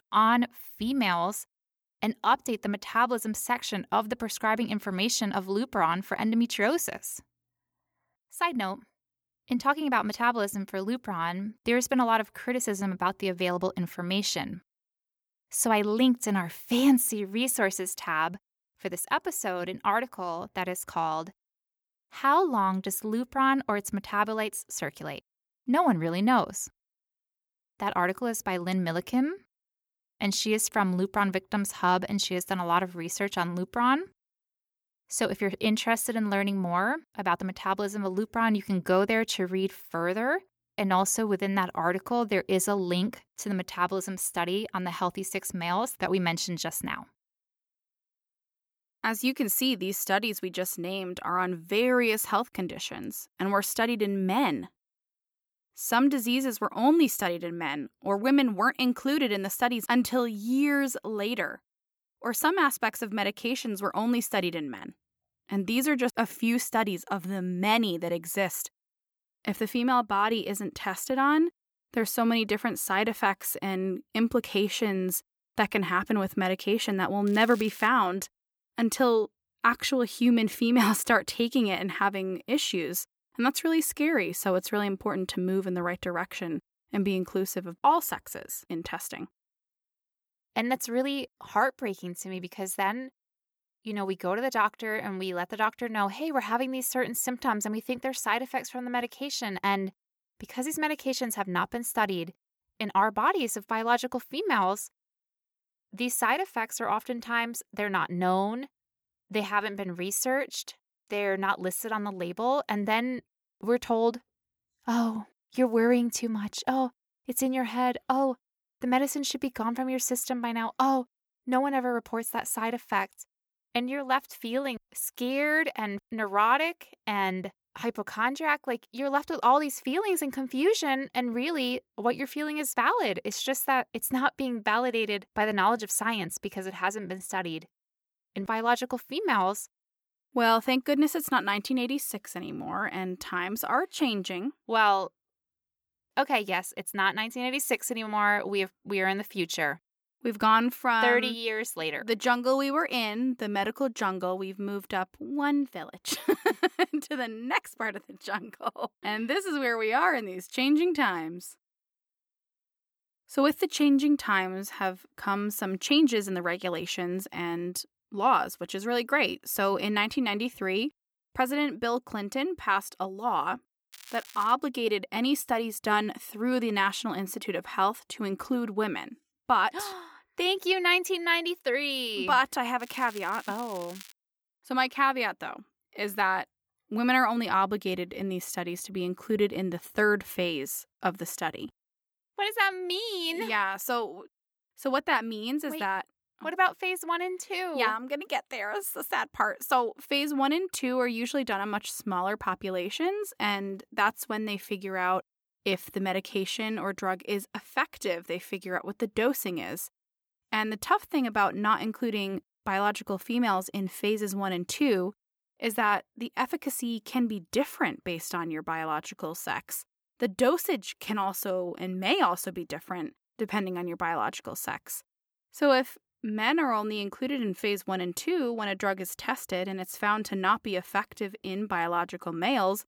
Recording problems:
crackling; noticeable; at 1:17, at 2:54 and from 3:03 to 3:04; 20 dB below the speech

